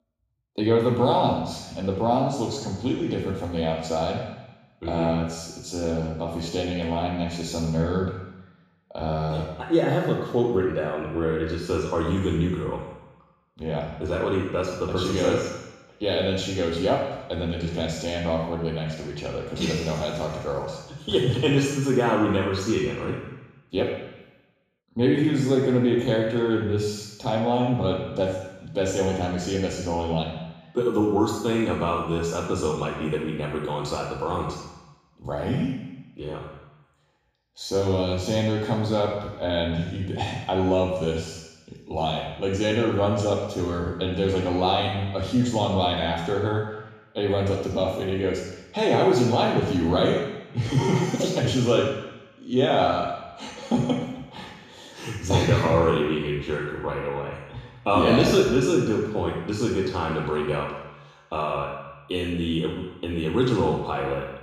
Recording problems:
off-mic speech; far
room echo; noticeable; dies away in 1 s

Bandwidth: 15 kHz